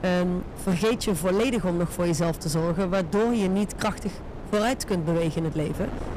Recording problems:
distortion; slight; 14% of the sound clipped
wind noise on the microphone; occasional gusts; 15 dB below the speech

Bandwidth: 14.5 kHz